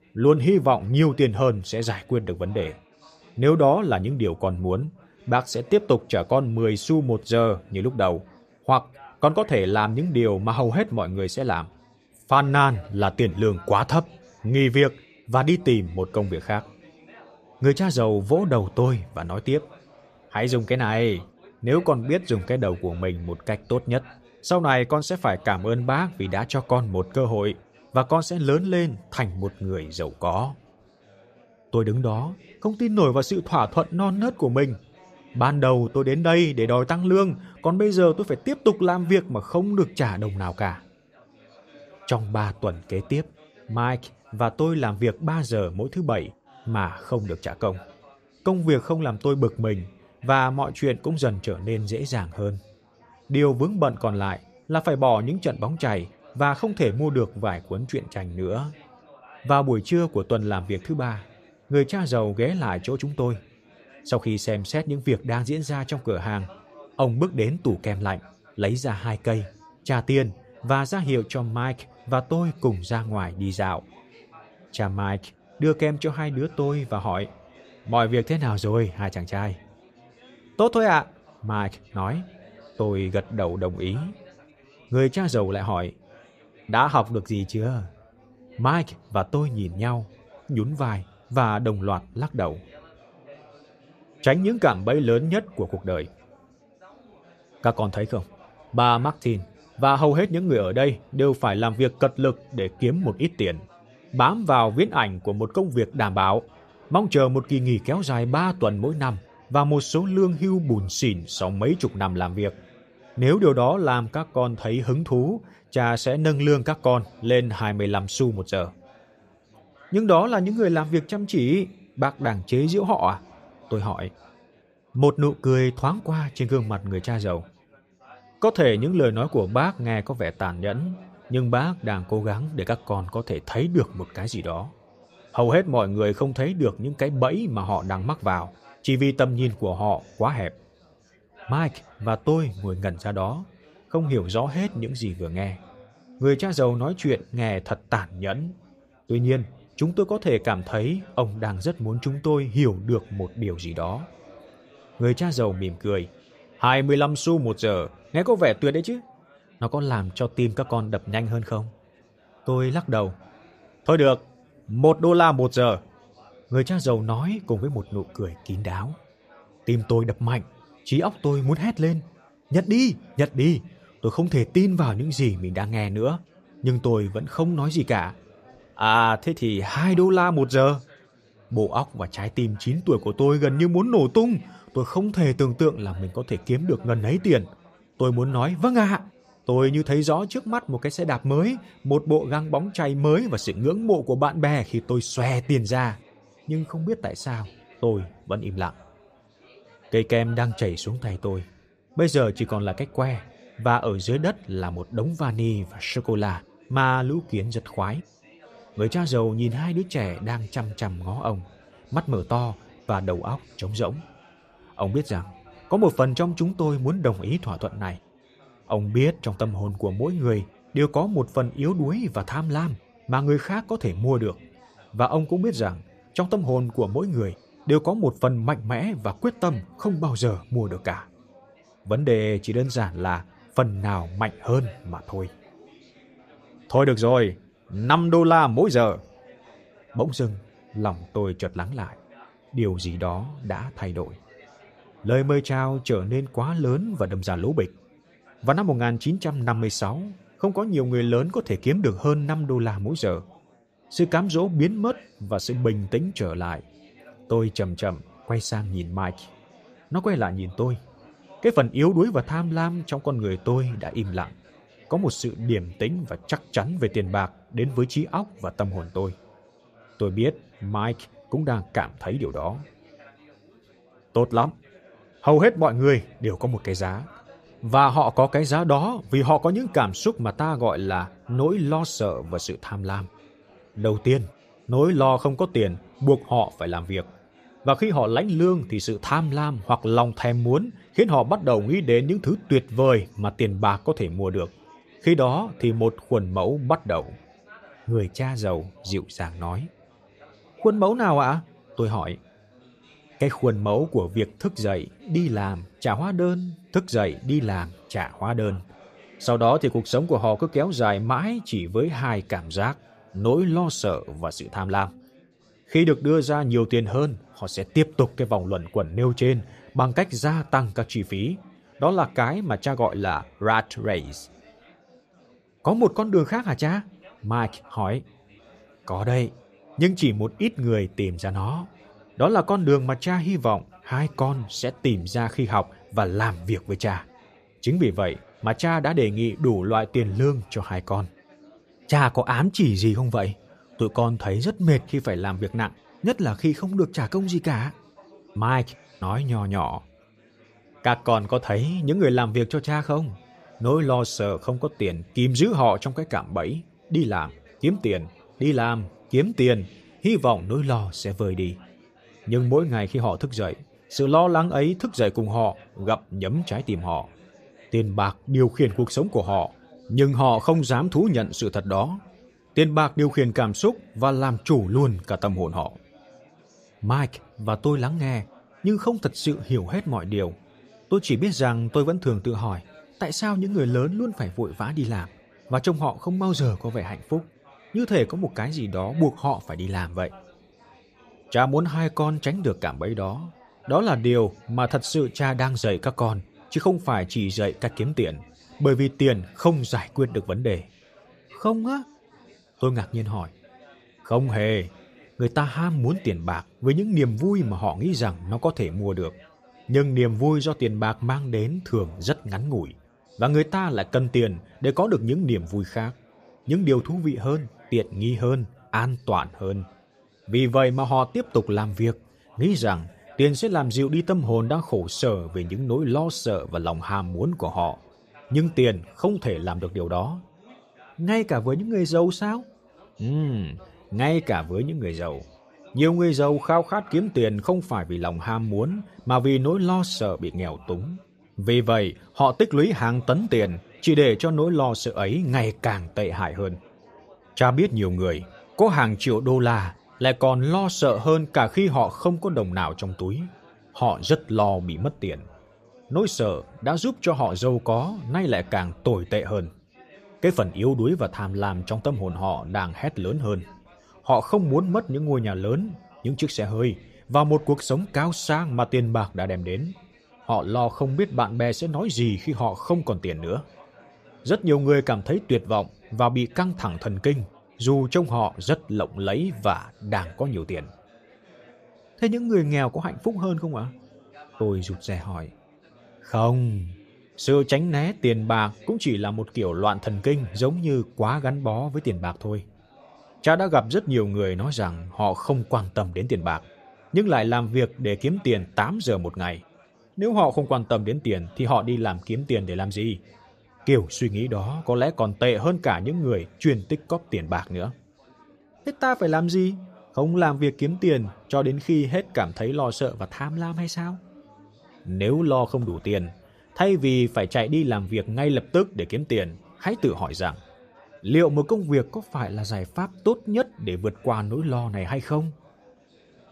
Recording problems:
chatter from many people; faint; throughout; 30 dB below the speech

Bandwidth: 14.5 kHz